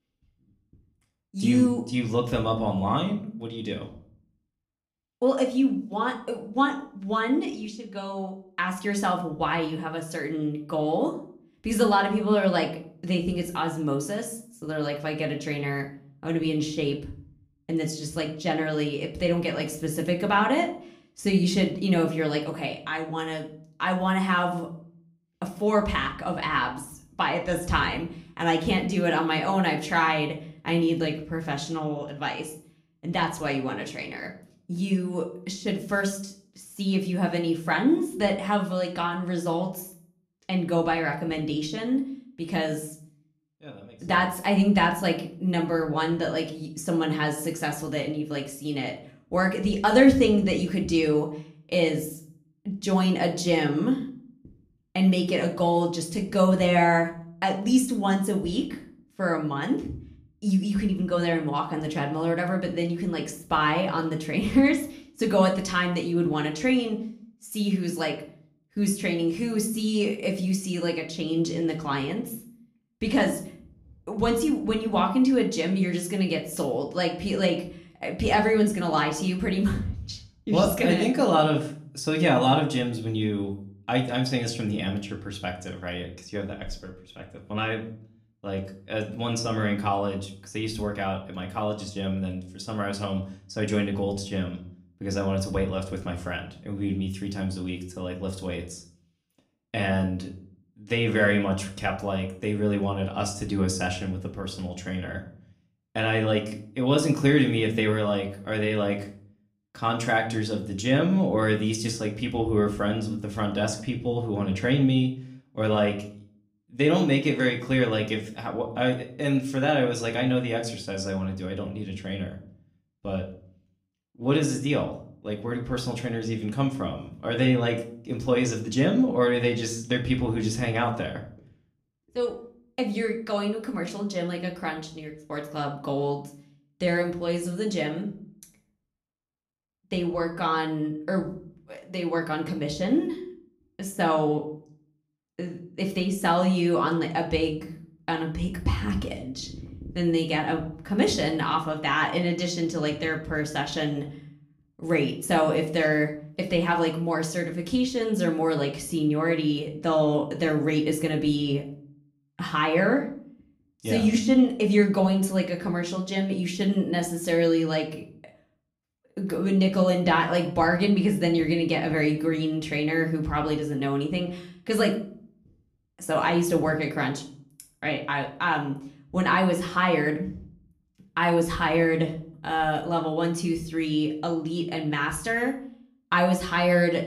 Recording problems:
room echo; slight; dies away in 0.4 s
off-mic speech; somewhat distant

